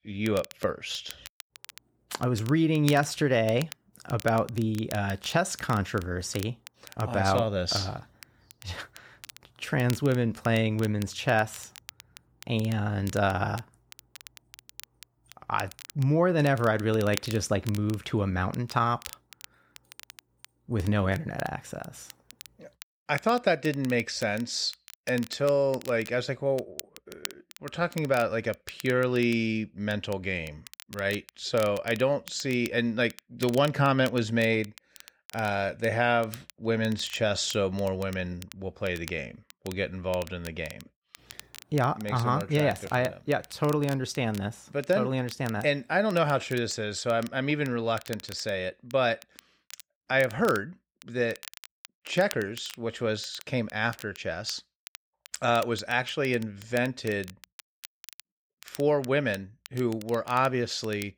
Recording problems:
crackle, like an old record; noticeable; 20 dB below the speech

